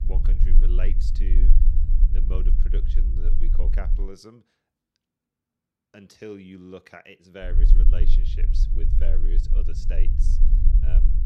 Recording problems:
low rumble; loud; until 4 s and from 7.5 s on; 4 dB below the speech

